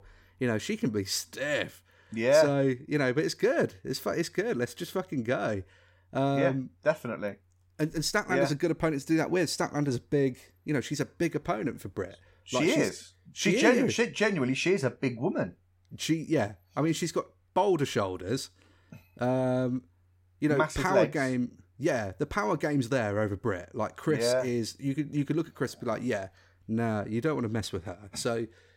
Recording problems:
none

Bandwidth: 16.5 kHz